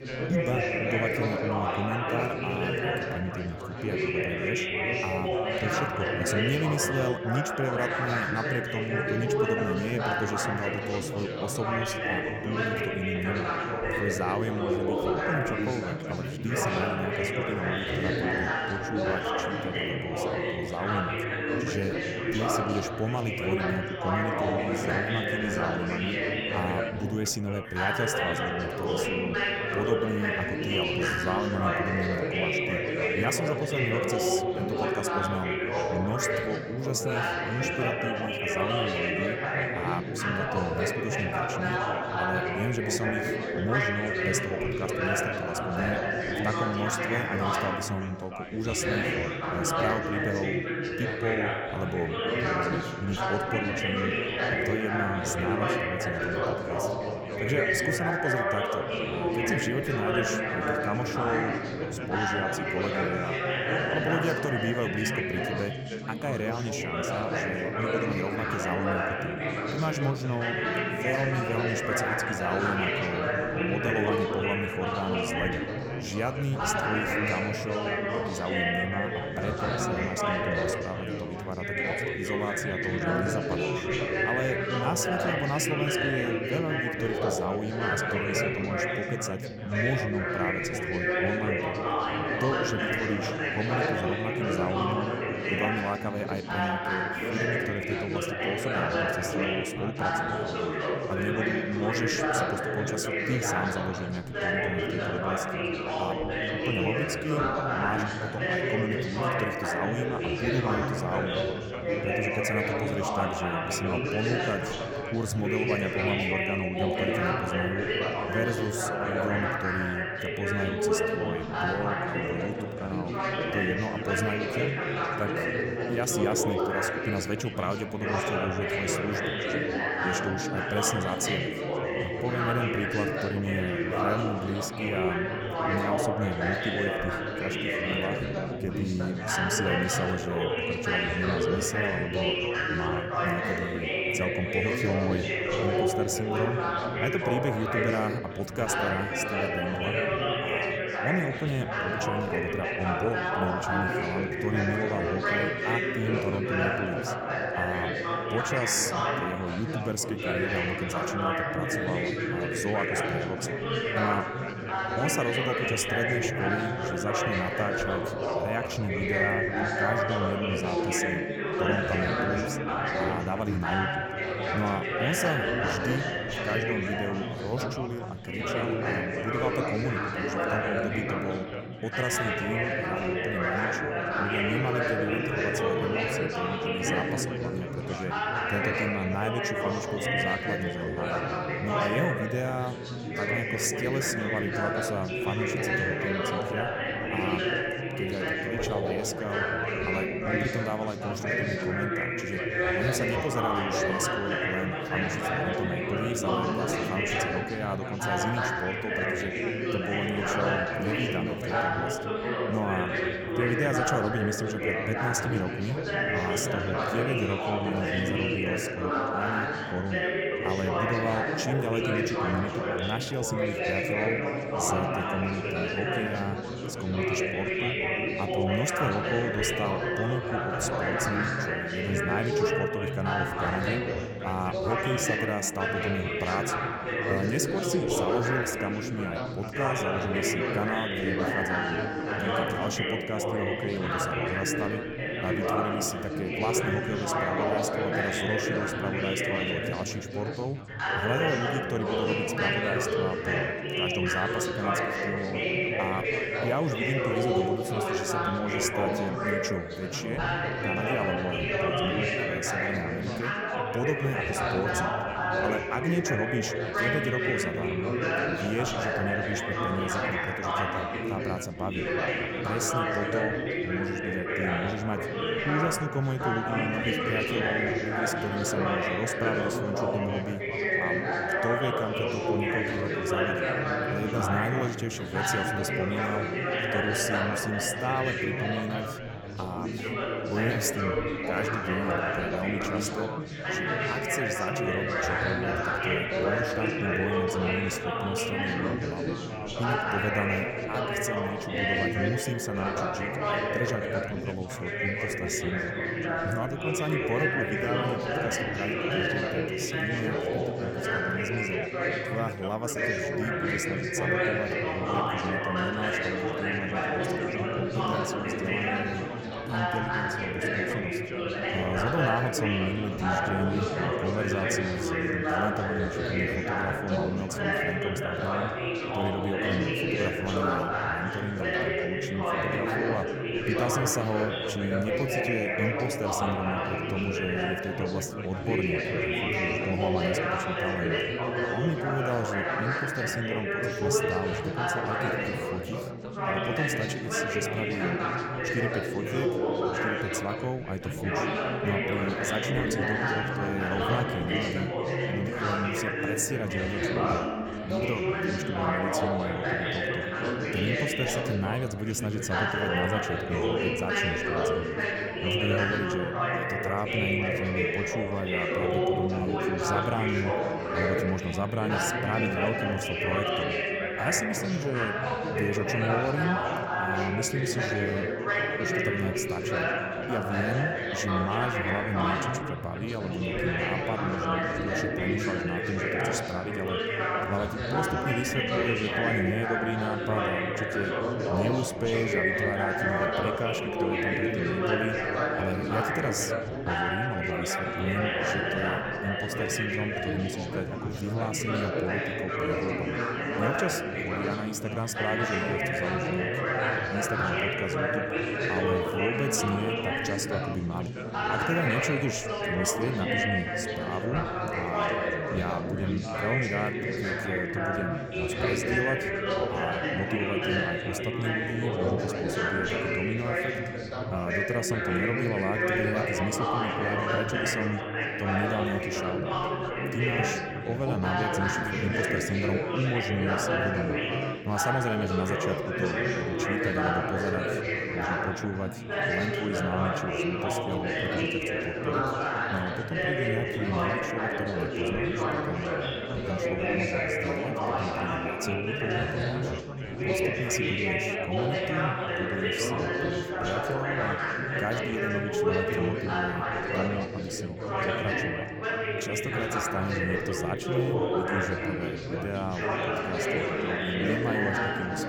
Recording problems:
chatter from many people; very loud; throughout; 4 dB above the speech

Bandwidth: 18 kHz